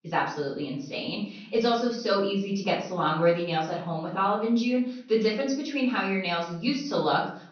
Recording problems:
off-mic speech; far
room echo; noticeable; dies away in 0.5 s
high frequencies cut off; noticeable; nothing above 6 kHz

